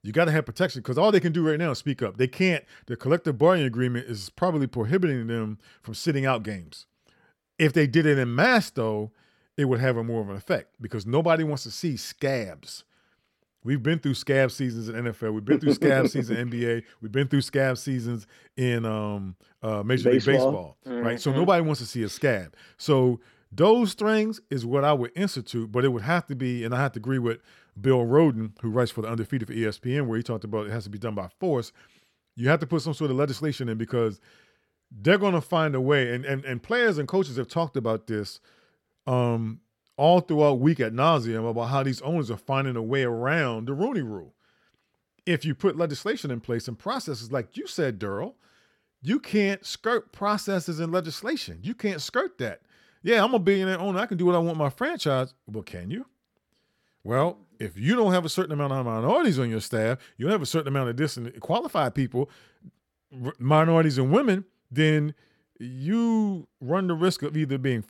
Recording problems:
none

